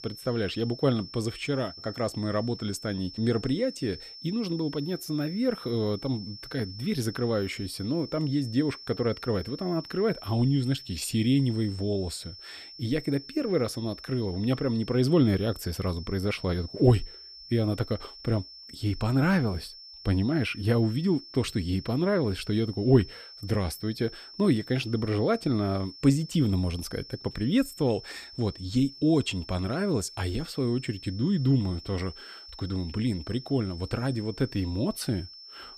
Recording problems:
high-pitched whine; noticeable; throughout; 5.5 kHz, 15 dB below the speech

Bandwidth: 15 kHz